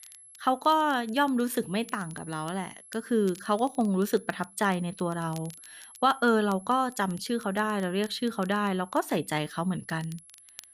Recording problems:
high-pitched whine; faint; throughout; 11 kHz, 20 dB below the speech
crackle, like an old record; faint; 25 dB below the speech

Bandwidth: 14.5 kHz